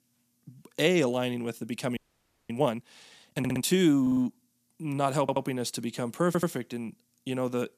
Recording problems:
audio freezing; at 2 s for 0.5 s
audio stuttering; 4 times, first at 3.5 s

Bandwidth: 14.5 kHz